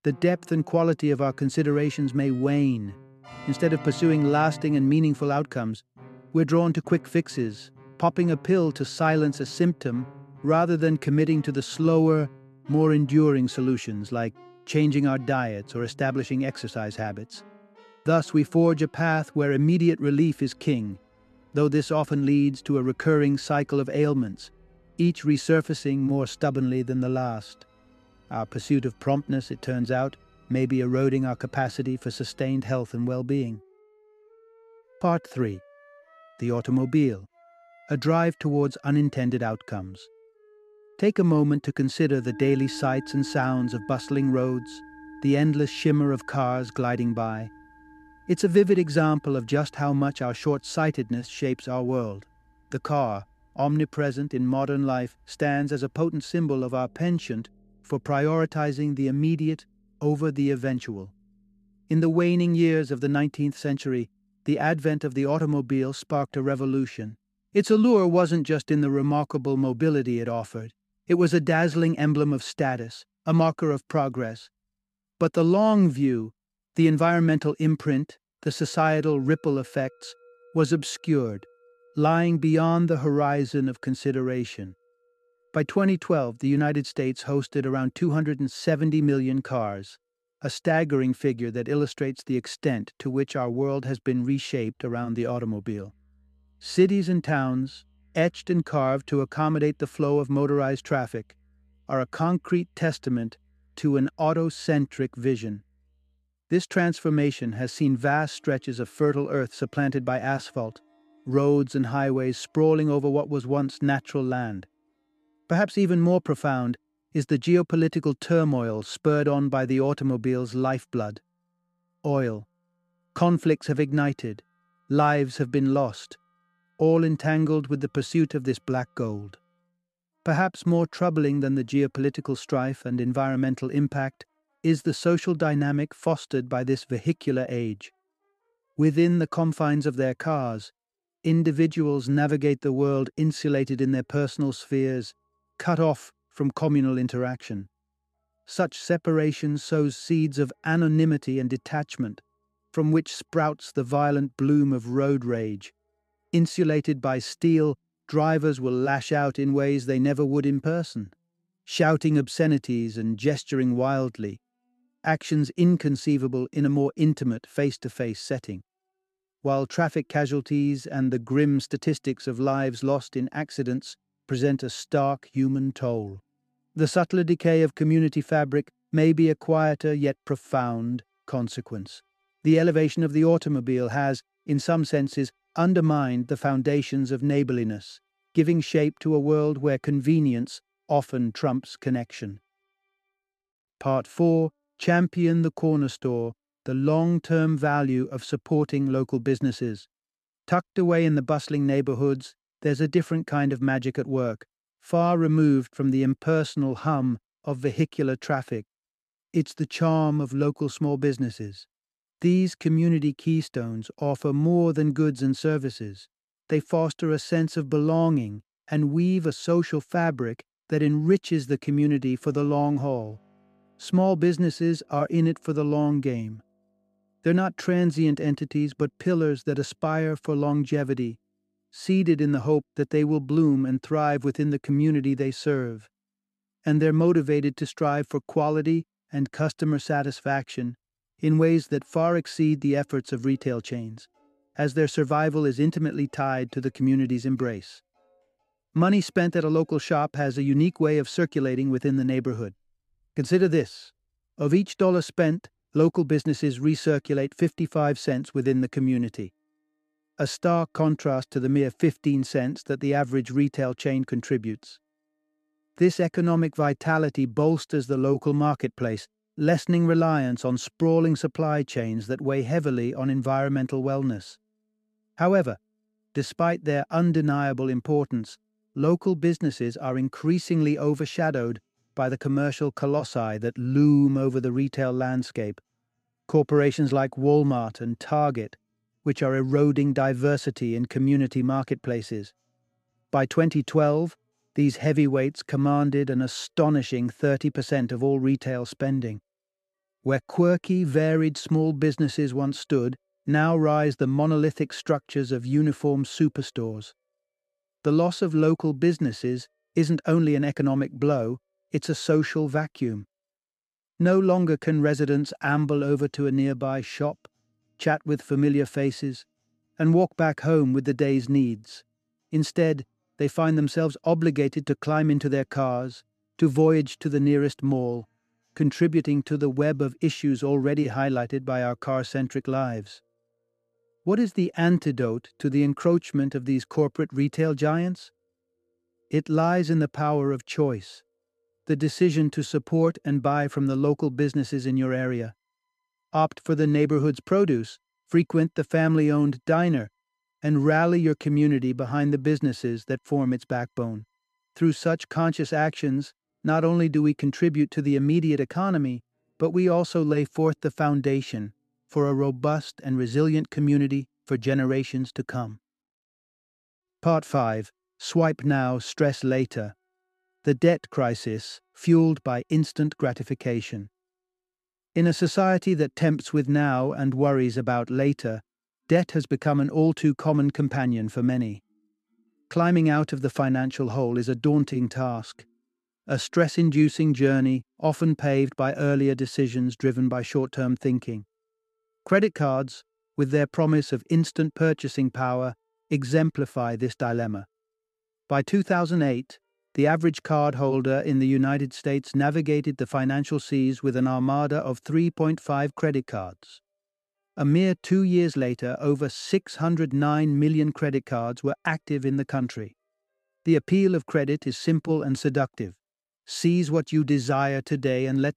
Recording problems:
background music; faint; throughout; 25 dB below the speech

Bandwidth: 13.5 kHz